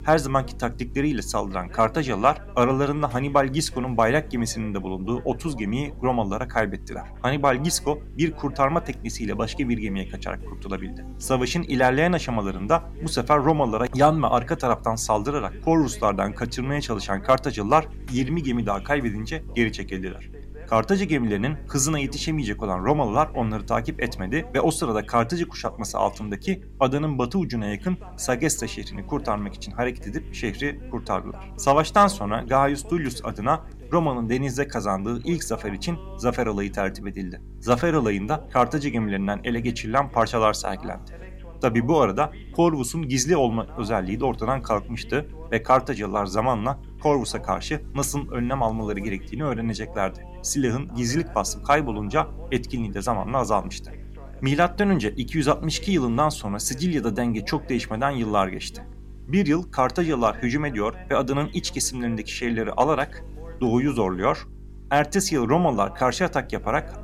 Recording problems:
electrical hum; faint; throughout; 50 Hz, 30 dB below the speech
voice in the background; faint; throughout; 25 dB below the speech

